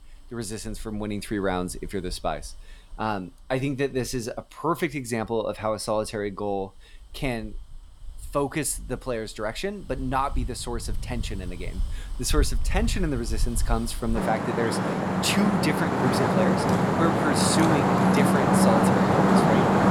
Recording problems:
traffic noise; very loud; throughout; 5 dB above the speech

